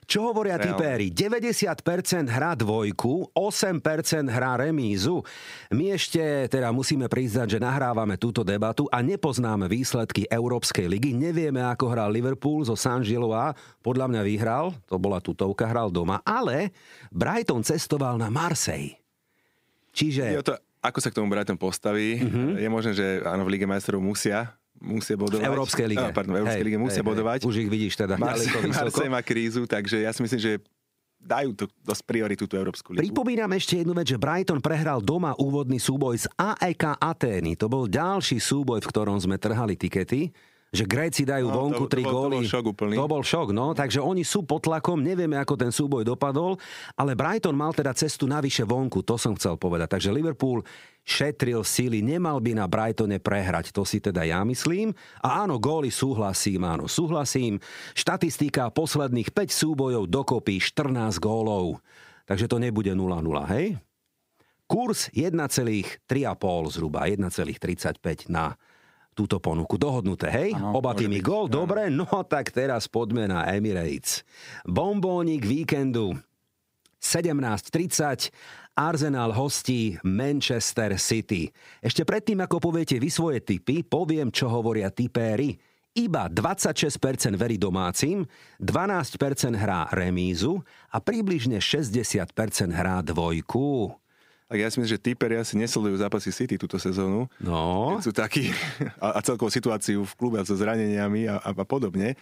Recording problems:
squashed, flat; somewhat

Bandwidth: 15.5 kHz